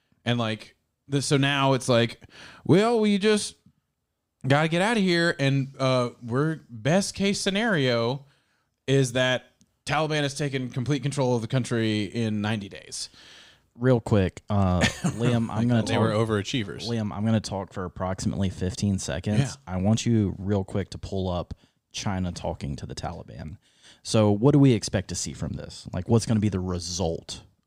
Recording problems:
none

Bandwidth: 15.5 kHz